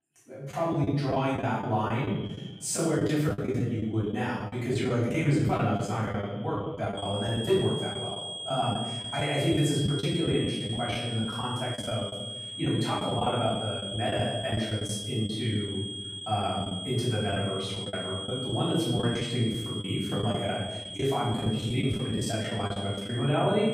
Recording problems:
off-mic speech; far
room echo; noticeable; dies away in 1.1 s
echo of what is said; faint; throughout; 280 ms later, 25 dB below the speech
high-pitched whine; loud; from 7 s on; 3.5 kHz, 6 dB below the speech
choppy; very; 11% of the speech affected

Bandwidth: 15.5 kHz